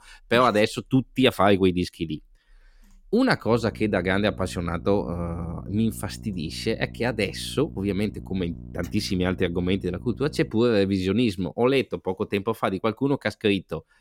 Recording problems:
electrical hum; faint; from 3.5 to 11 s; 60 Hz, 25 dB below the speech

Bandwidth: 16.5 kHz